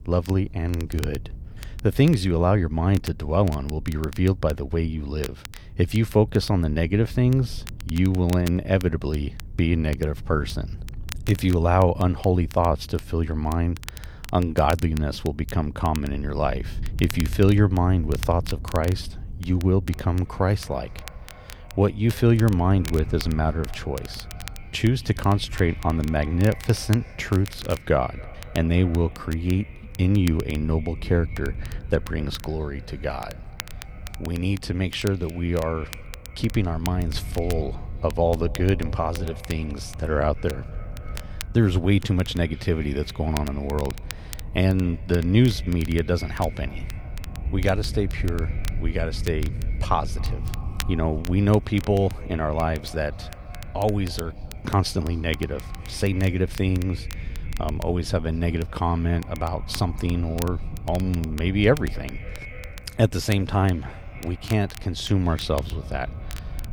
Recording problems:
echo of what is said; faint; from 20 s on; 270 ms later, 25 dB below the speech
wind noise on the microphone; occasional gusts; 25 dB below the speech
crackle, like an old record; noticeable; 20 dB below the speech

